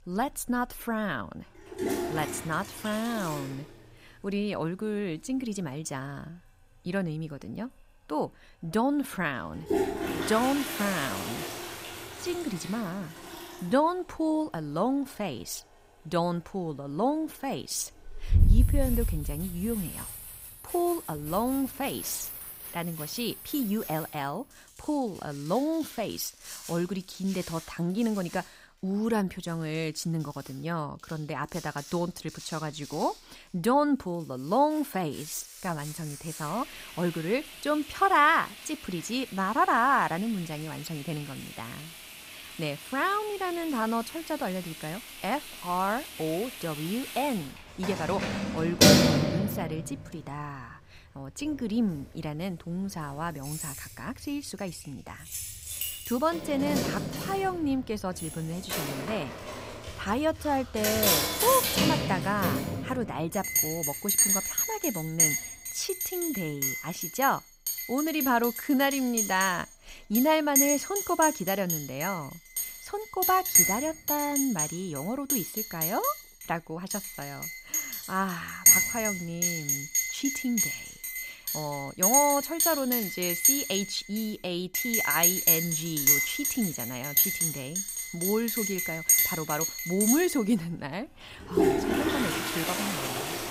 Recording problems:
household noises; very loud; throughout; 3 dB above the speech

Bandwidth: 15.5 kHz